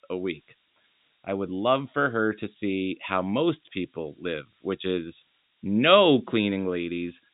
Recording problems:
high frequencies cut off; severe; nothing above 4 kHz
hiss; very faint; throughout; 40 dB below the speech

